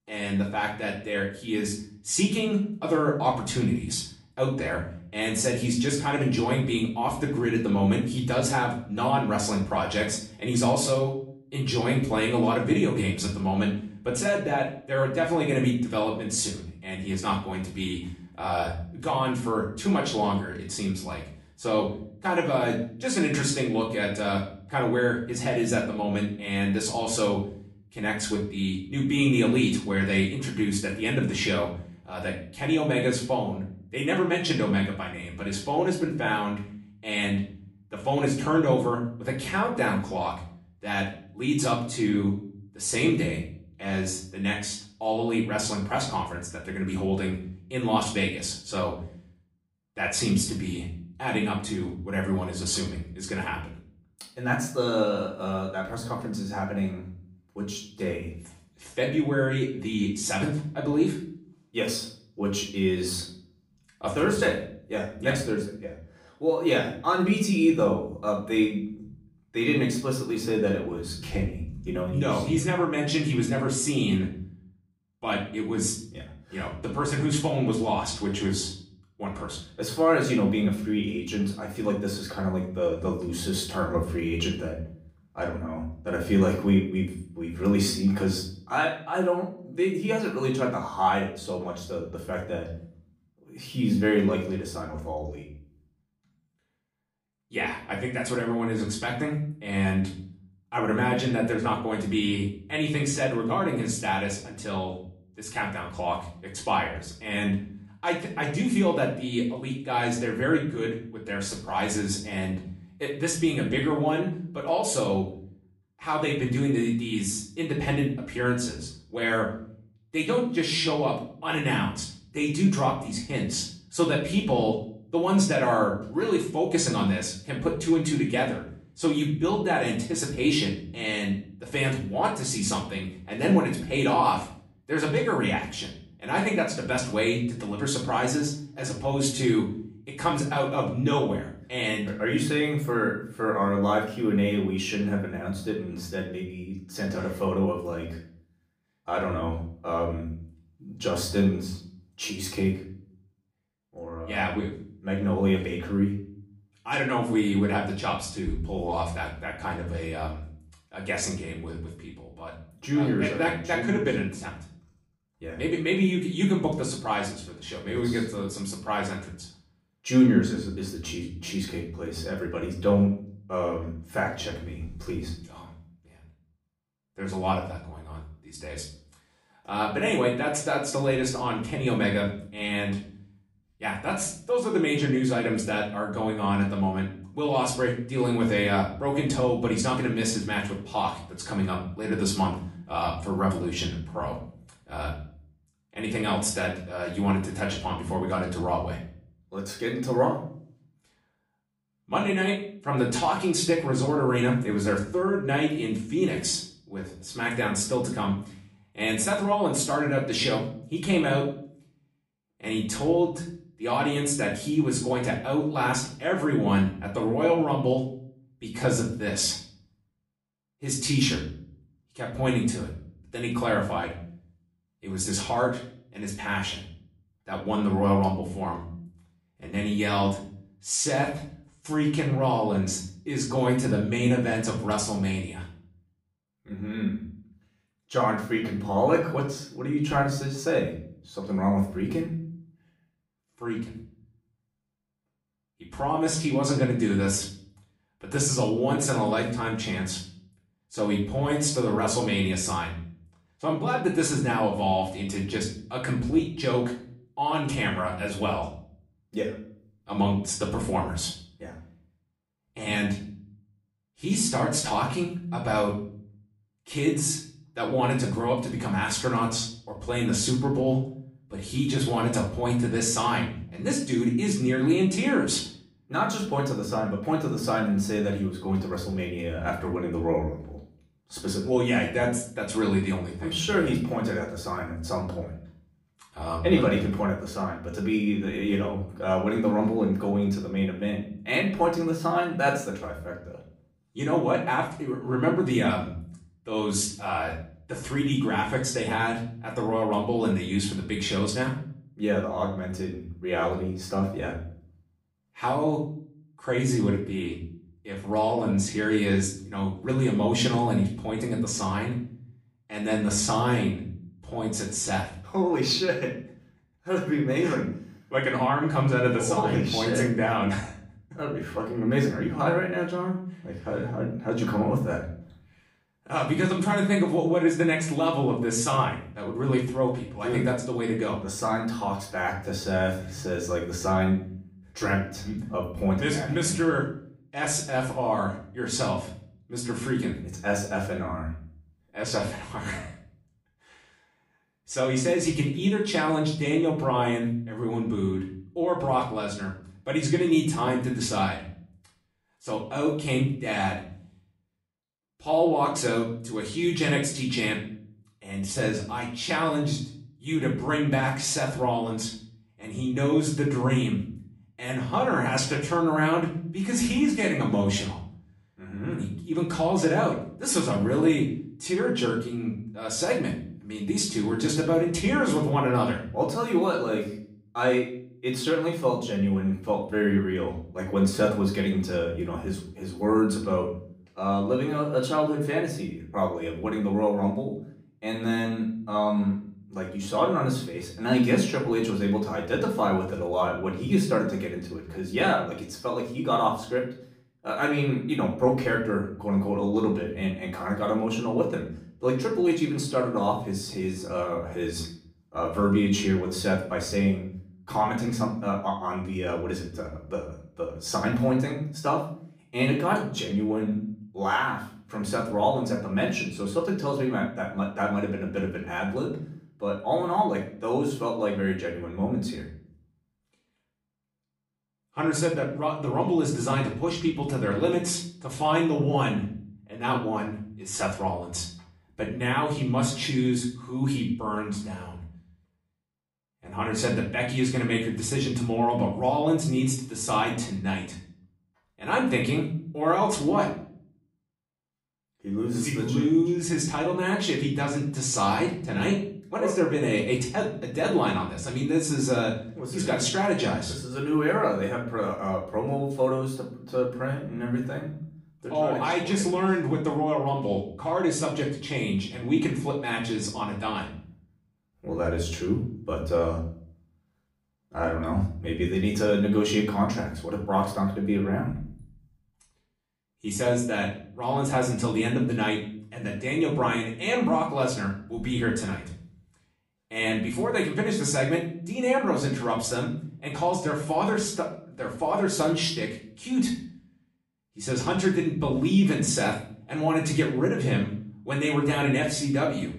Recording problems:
off-mic speech; far
room echo; slight; dies away in 0.5 s

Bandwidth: 15.5 kHz